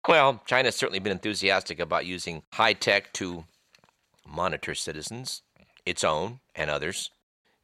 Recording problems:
none

